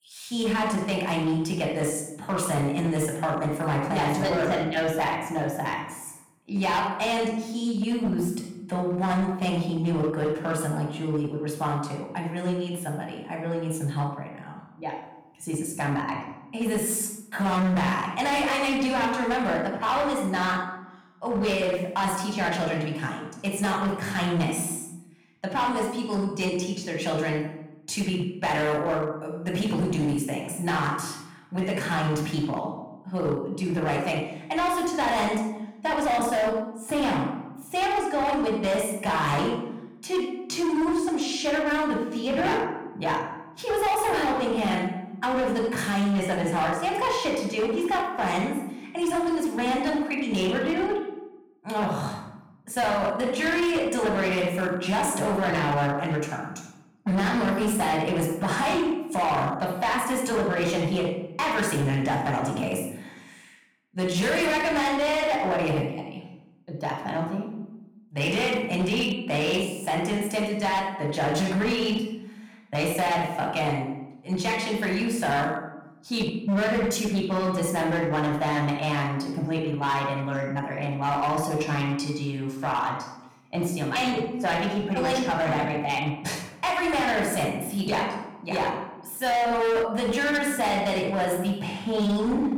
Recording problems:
room echo; noticeable; dies away in 0.7 s
distortion; slight; 13% of the sound clipped
off-mic speech; somewhat distant

